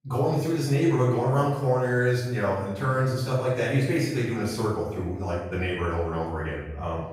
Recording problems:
off-mic speech; far
room echo; noticeable; dies away in 0.8 s

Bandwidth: 15.5 kHz